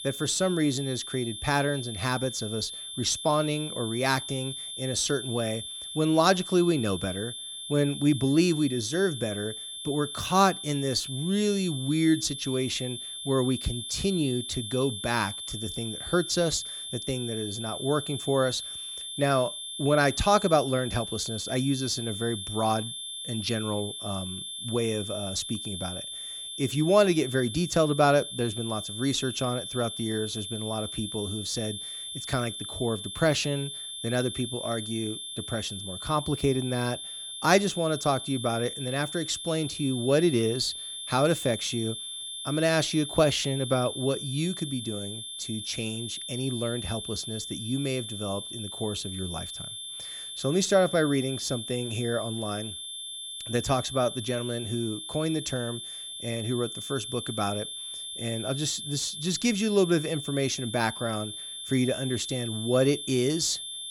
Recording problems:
high-pitched whine; loud; throughout; 3.5 kHz, 7 dB below the speech

